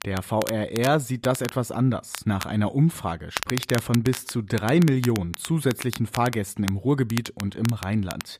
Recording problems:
crackle, like an old record; noticeable; 10 dB below the speech

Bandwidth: 14.5 kHz